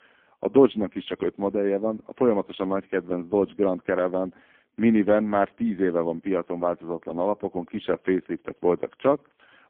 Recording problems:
phone-call audio; poor line; nothing above 3.5 kHz

